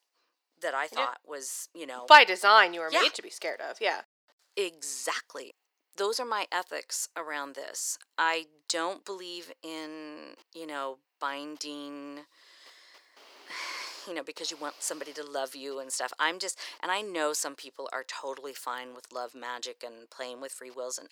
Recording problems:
thin; very; fading below 400 Hz

